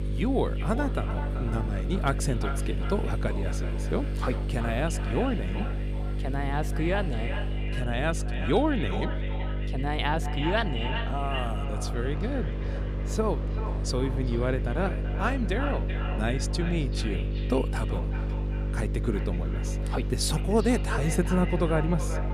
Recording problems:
echo of what is said; strong; throughout; 380 ms later, 10 dB below the speech
electrical hum; noticeable; throughout; 50 Hz, 10 dB below the speech
train or aircraft noise; noticeable; throughout; 20 dB below the speech

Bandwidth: 14.5 kHz